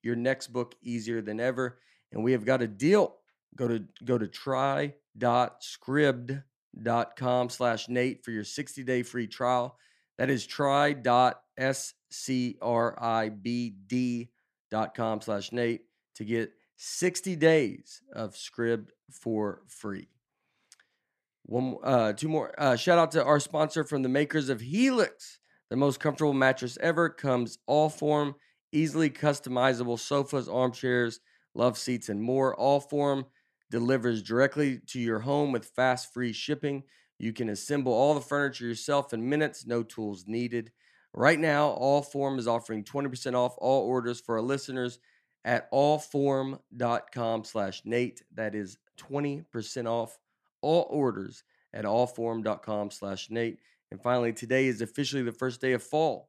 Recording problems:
none

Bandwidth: 14.5 kHz